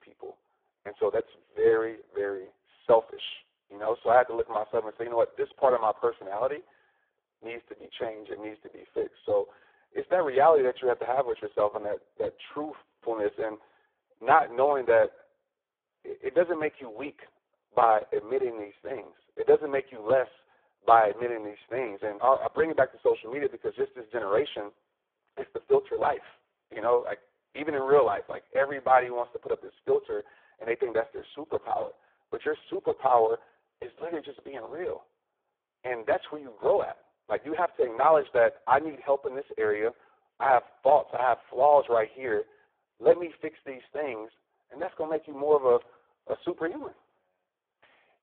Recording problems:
phone-call audio; poor line

